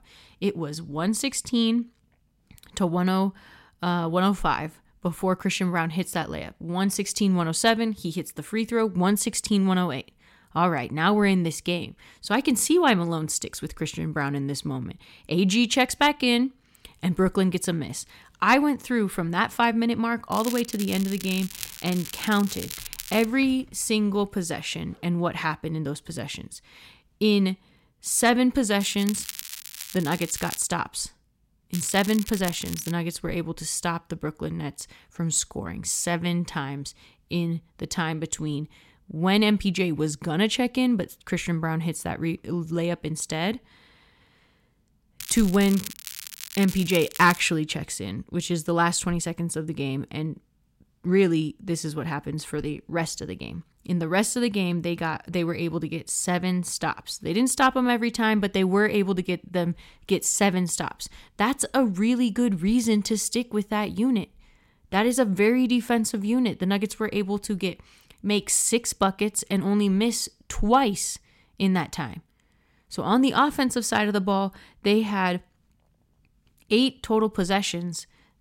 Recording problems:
crackling; noticeable; 4 times, first at 20 s; 10 dB below the speech

